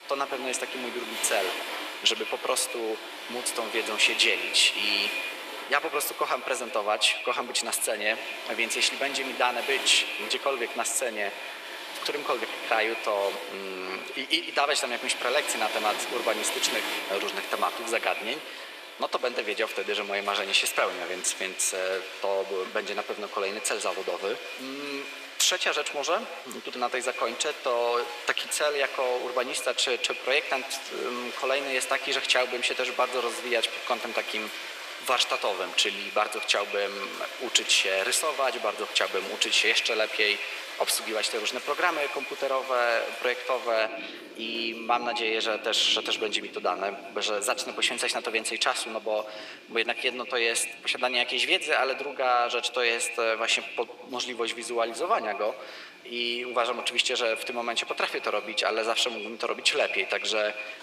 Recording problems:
echo of what is said; strong; throughout; 100 ms later, 10 dB below the speech
thin; very; fading below 400 Hz
rain or running water; loud; throughout; 10 dB below the speech

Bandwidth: 14.5 kHz